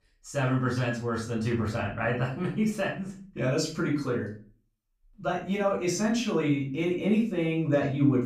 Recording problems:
off-mic speech; far
room echo; slight; dies away in 0.3 s

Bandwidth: 15 kHz